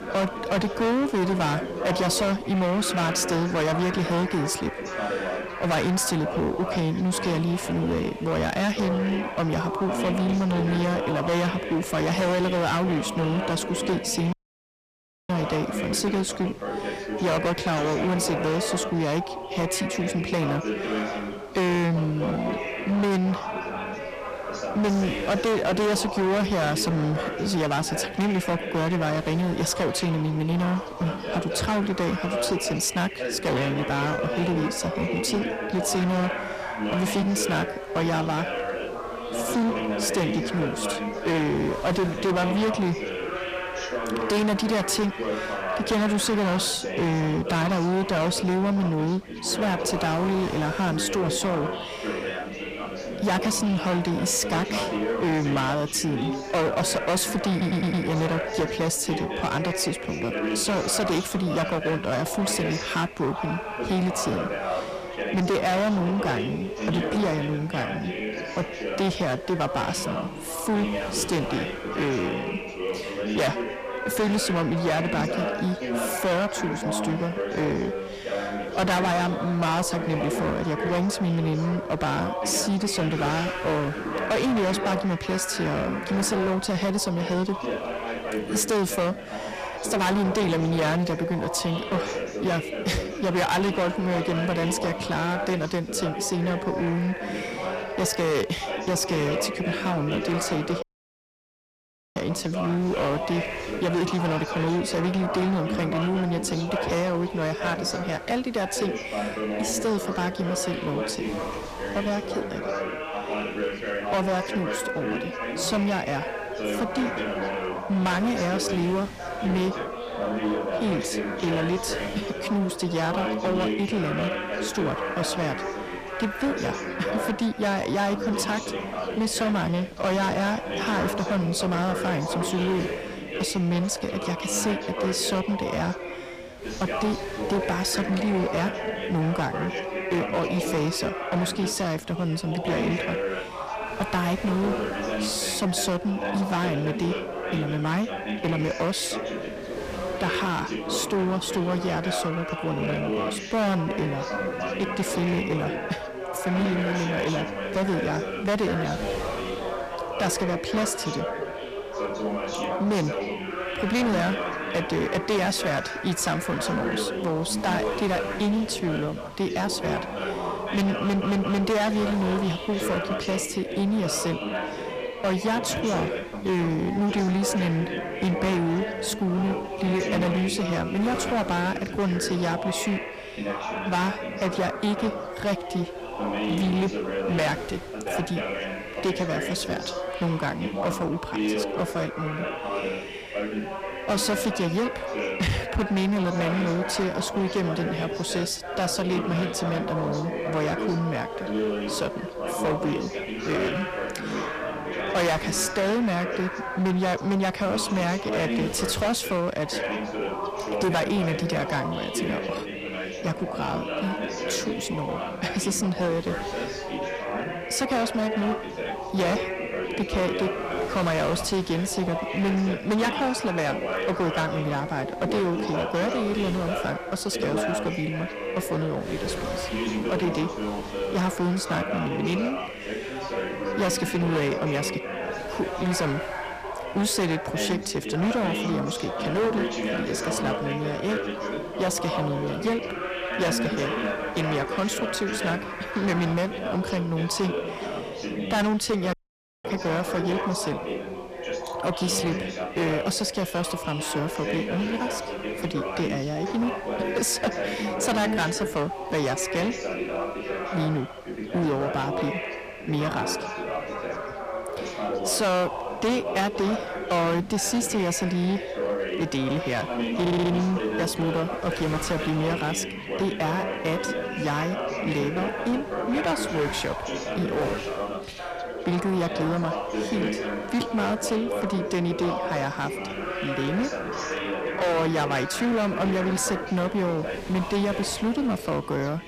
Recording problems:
distortion; heavy; 14% of the sound clipped
background chatter; loud; throughout; 4 voices, 4 dB below the speech
wind noise on the microphone; occasional gusts; 20 dB below the speech
audio cutting out; at 14 s for 1 s, at 1:41 for 1.5 s and at 4:09 for 0.5 s
audio stuttering; at 58 s, at 2:51 and at 4:30

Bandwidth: 15 kHz